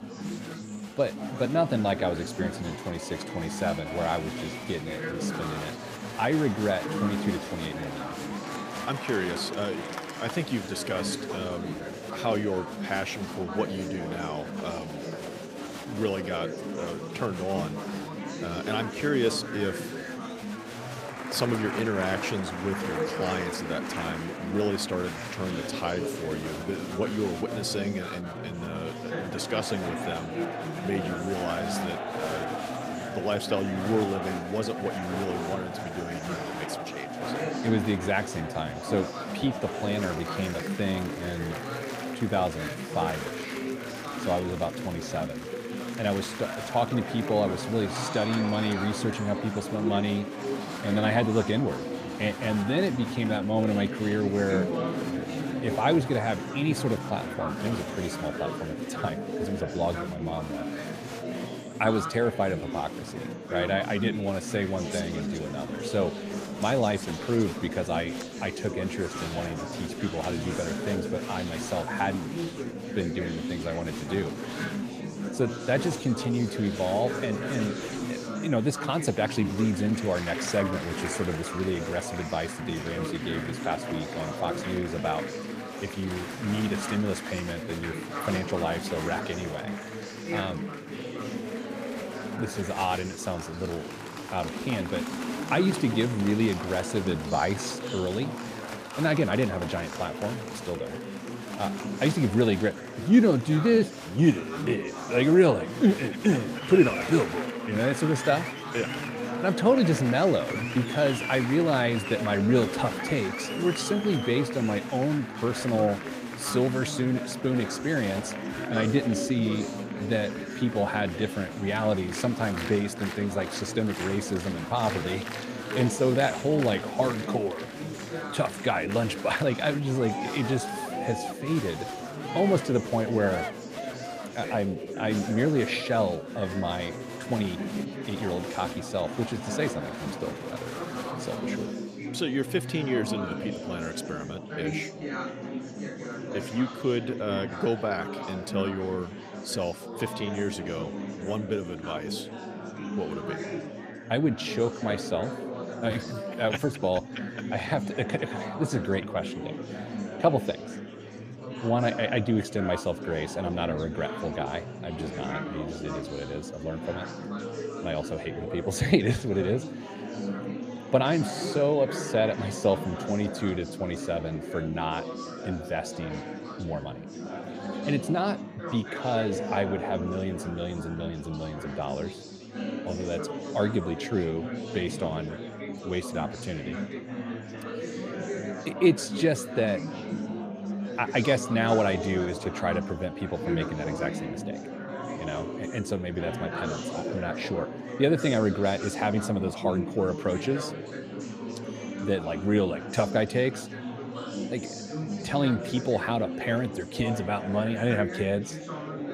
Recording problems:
murmuring crowd; loud; throughout; 6 dB below the speech

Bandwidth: 15 kHz